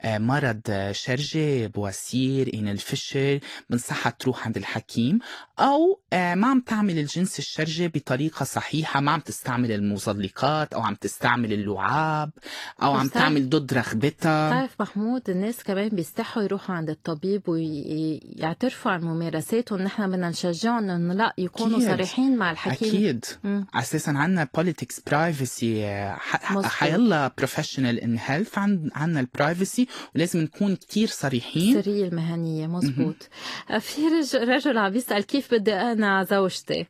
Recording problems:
garbled, watery; slightly; nothing above 14.5 kHz

